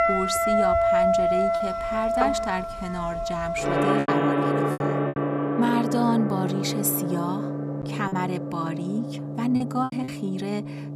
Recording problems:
background music; very loud; throughout; 3 dB above the speech
choppy; occasionally; 4% of the speech affected

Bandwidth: 14.5 kHz